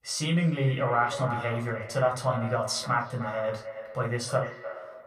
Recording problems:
echo of what is said; strong; throughout; 300 ms later, 10 dB below the speech
room echo; very slight; dies away in 0.2 s
off-mic speech; somewhat distant

